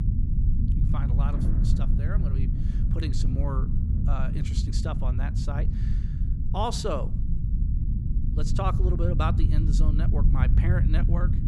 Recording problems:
rain or running water; loud; throughout; 9 dB below the speech
low rumble; loud; throughout; 5 dB below the speech

